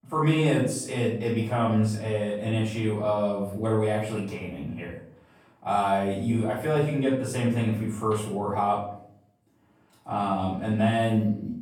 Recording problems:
off-mic speech; far
room echo; noticeable; dies away in 0.5 s

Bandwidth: 18 kHz